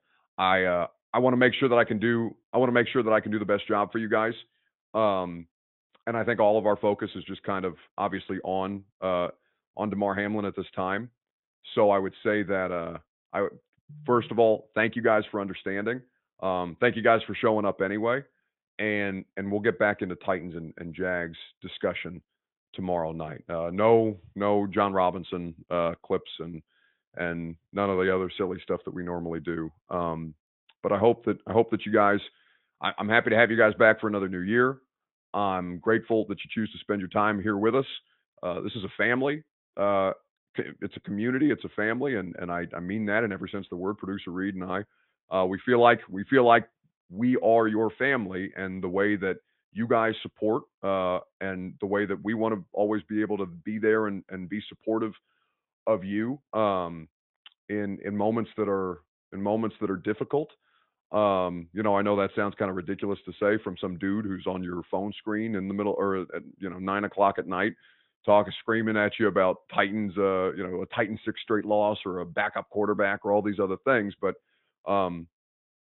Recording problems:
high frequencies cut off; severe; nothing above 3.5 kHz

